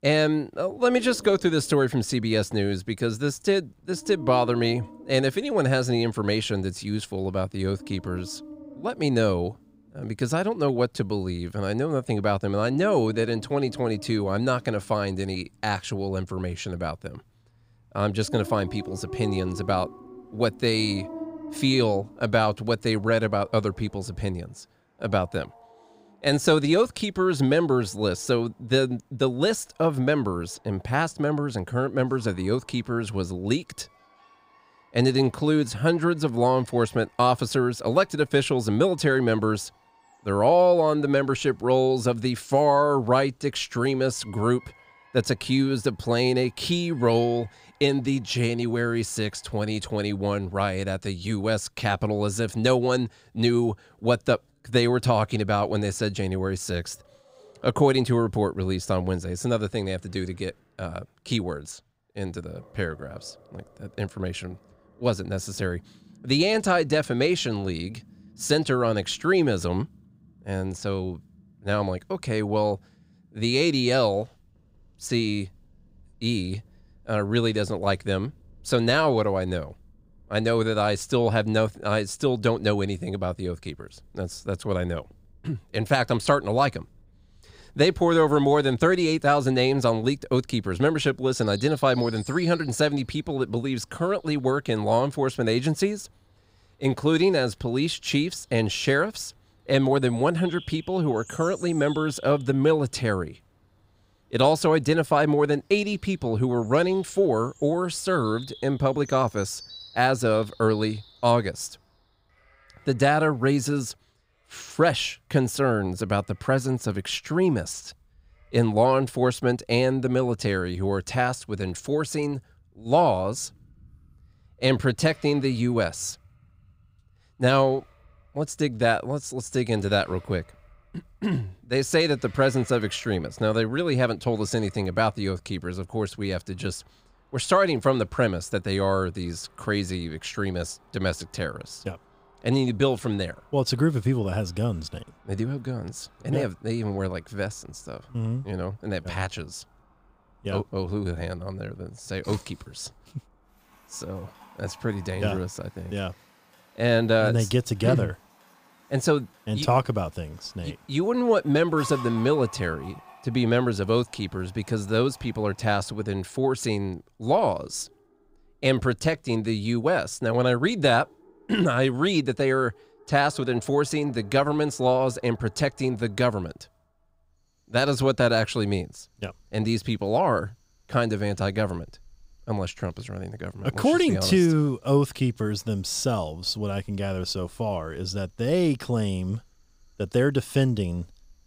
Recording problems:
animal sounds; faint; throughout; 25 dB below the speech

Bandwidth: 15.5 kHz